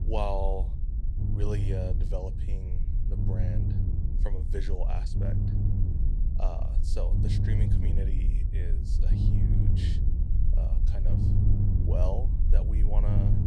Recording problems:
low rumble; loud; throughout; 3 dB below the speech

